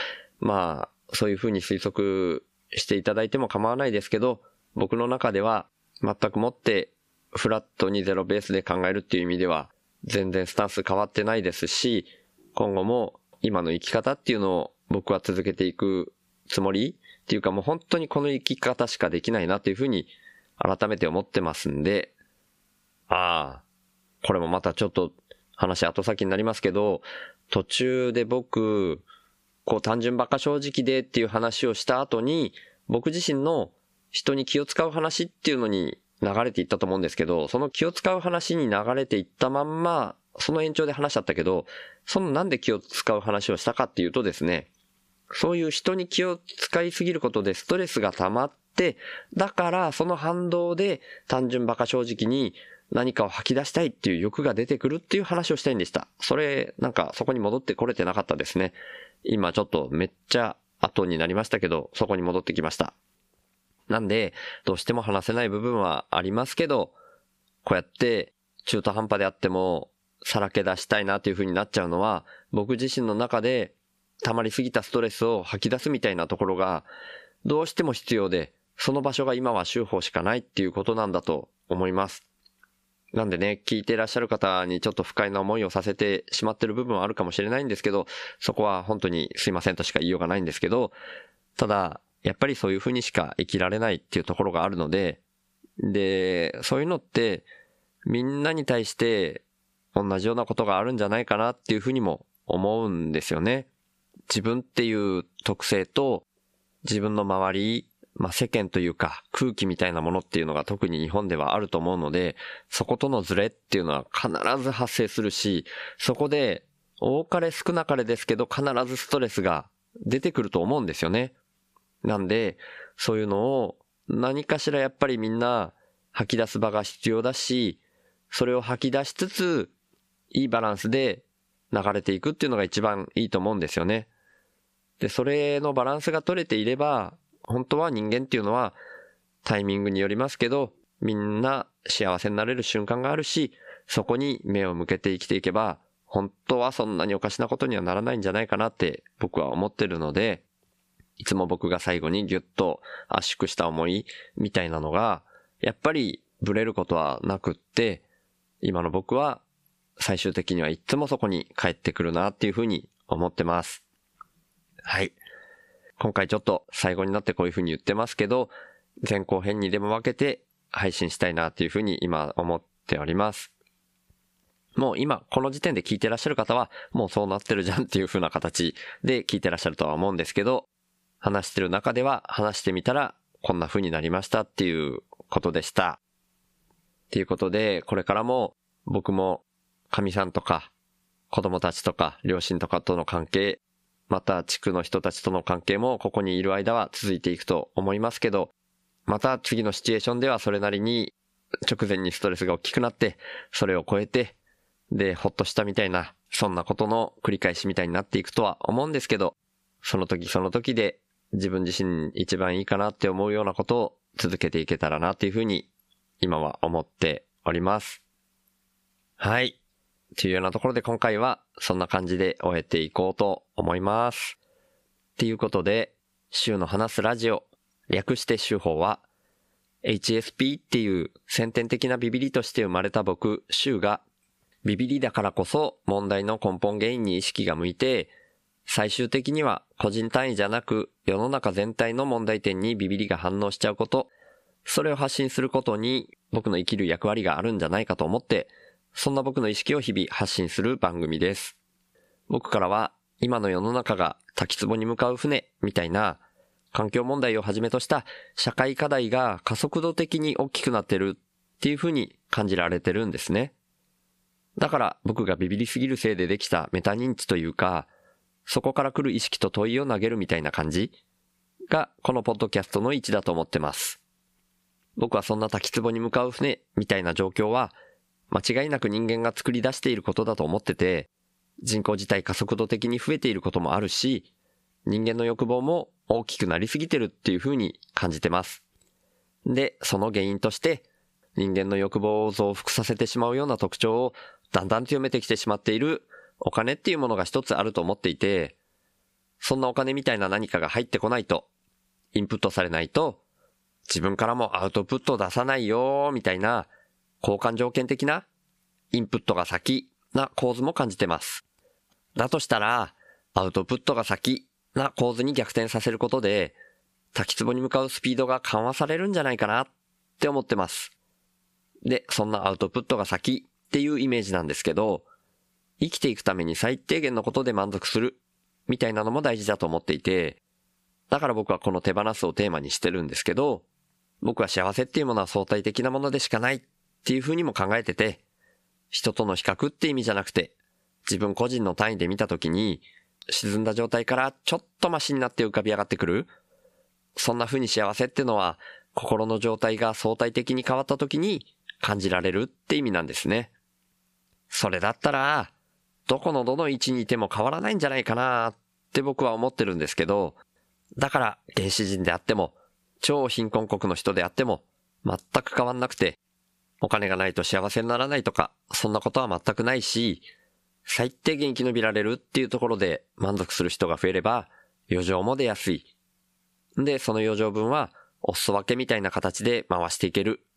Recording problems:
squashed, flat; somewhat

